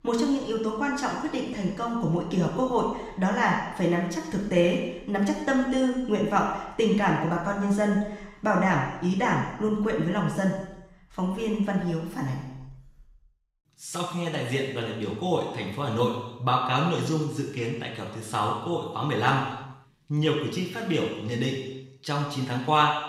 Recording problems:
off-mic speech; far
room echo; noticeable; dies away in 0.9 s

